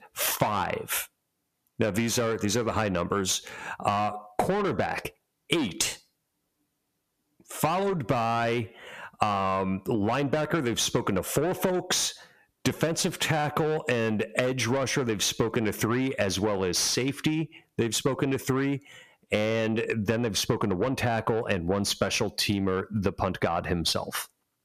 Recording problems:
distortion; heavy; 8 dB below the speech
squashed, flat; somewhat

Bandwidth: 14.5 kHz